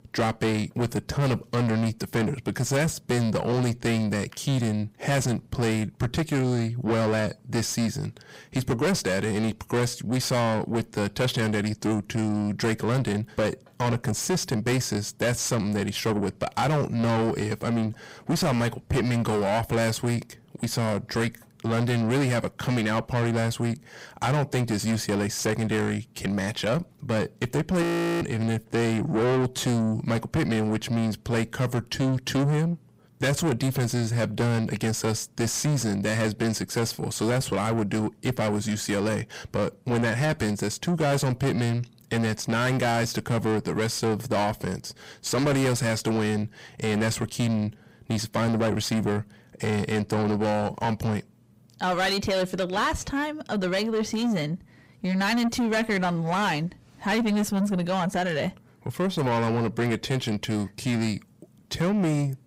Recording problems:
distortion; heavy; 6 dB below the speech
audio freezing; at 28 s

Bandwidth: 15.5 kHz